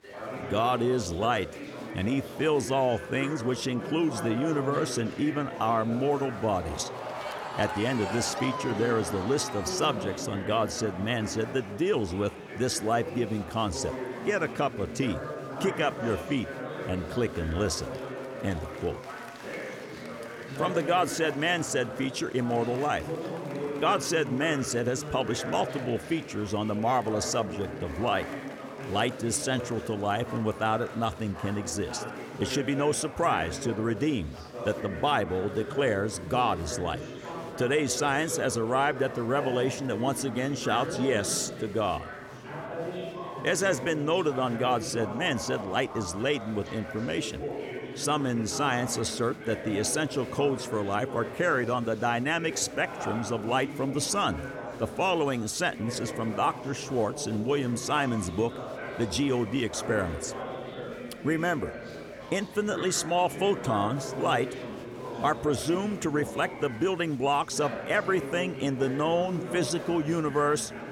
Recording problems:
chatter from many people; loud; throughout; 9 dB below the speech

